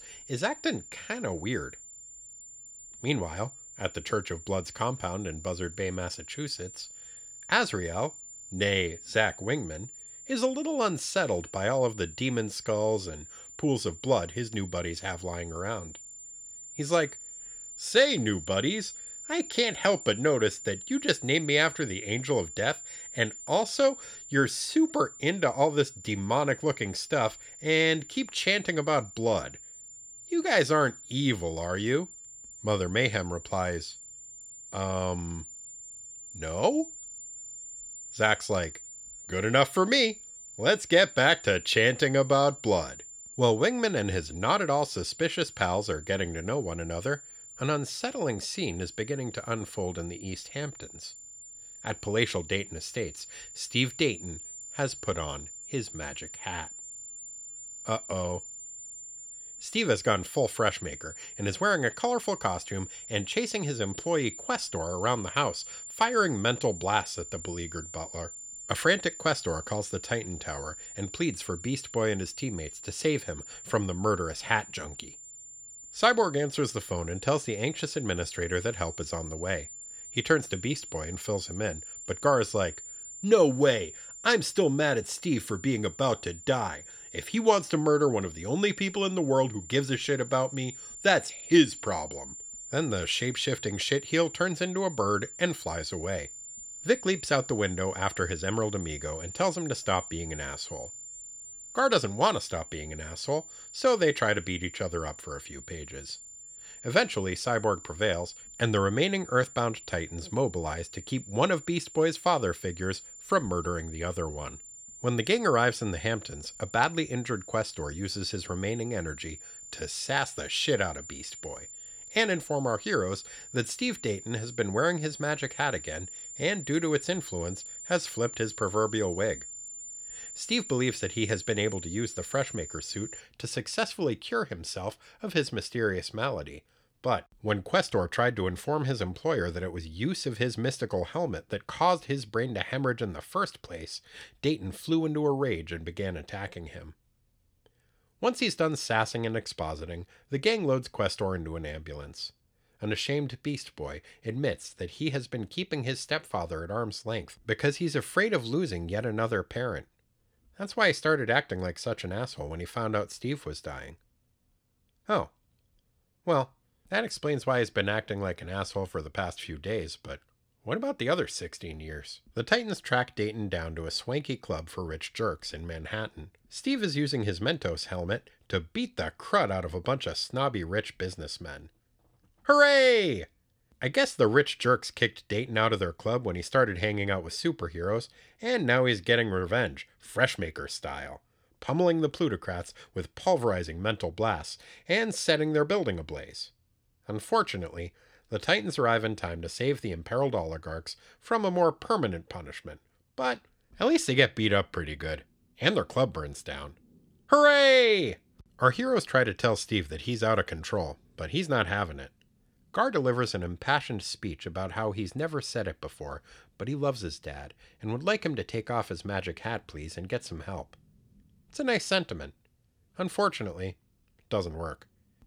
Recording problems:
high-pitched whine; noticeable; until 2:13; 7 kHz, 15 dB below the speech

